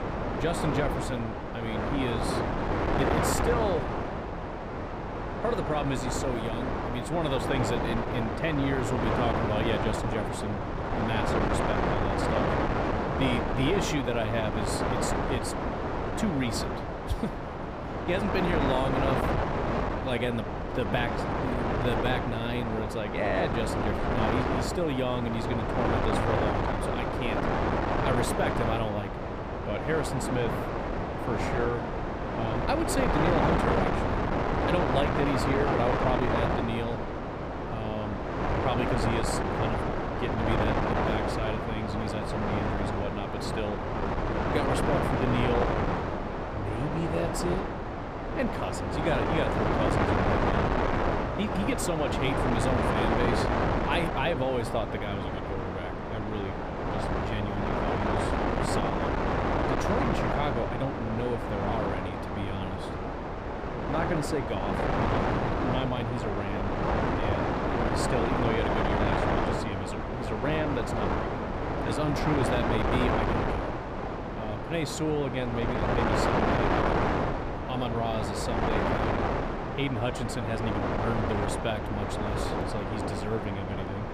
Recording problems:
wind noise on the microphone; heavy; 4 dB above the speech

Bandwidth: 15 kHz